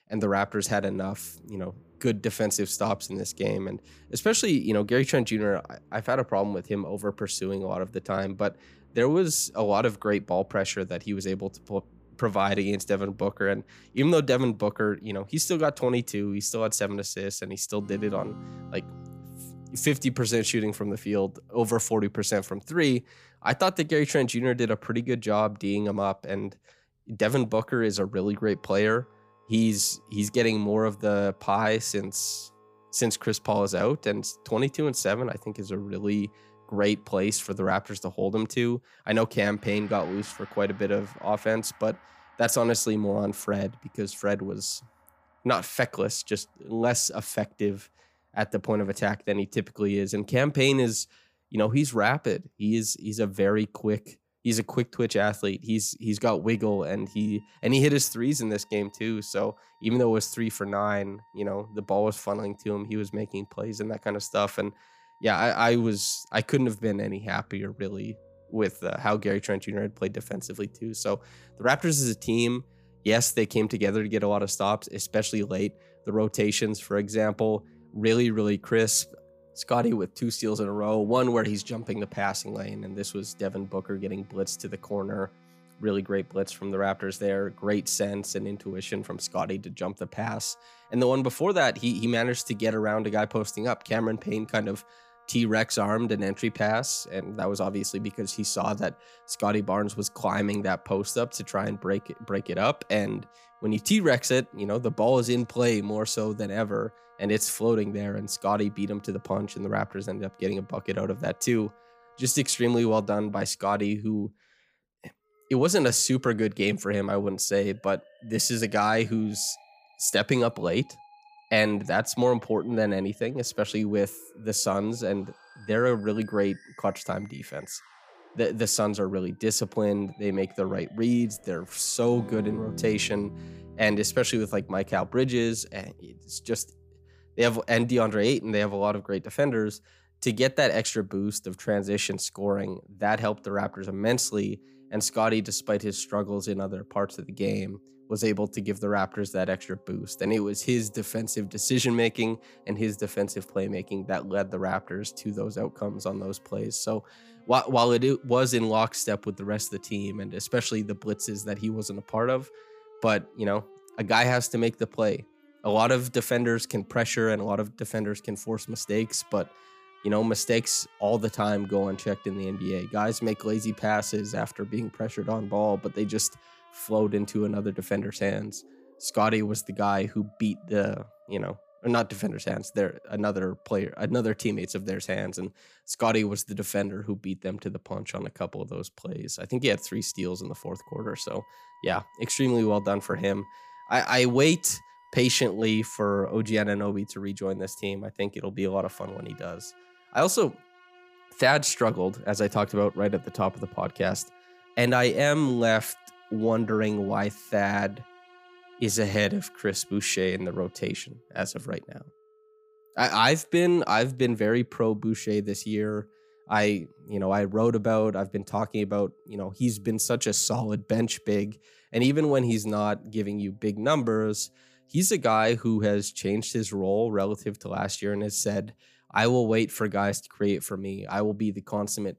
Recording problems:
background music; faint; throughout; 25 dB below the speech

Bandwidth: 15 kHz